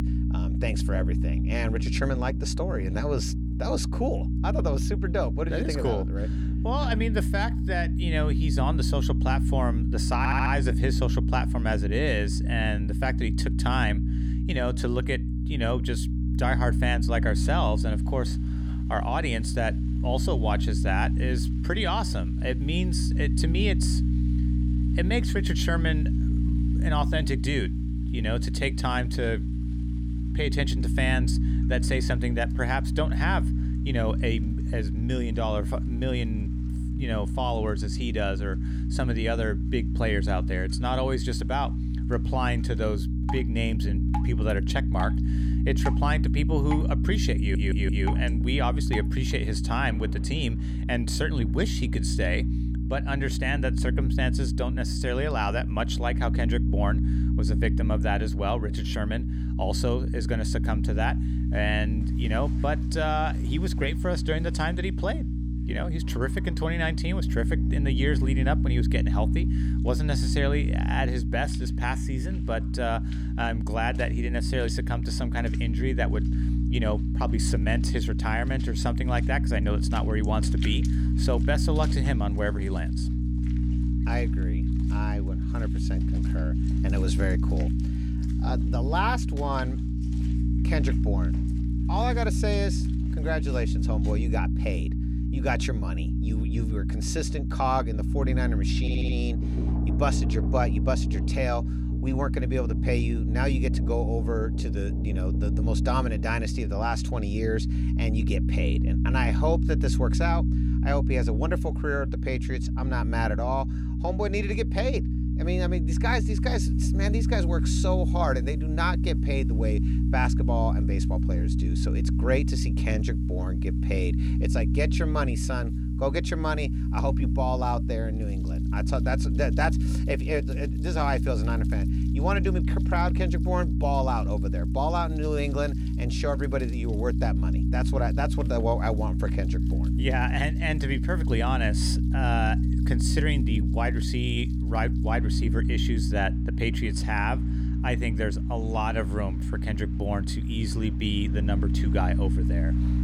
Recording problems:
electrical hum; loud; throughout; 60 Hz, 7 dB below the speech
rain or running water; noticeable; throughout; 20 dB below the speech
audio stuttering; at 10 s, at 47 s and at 1:39

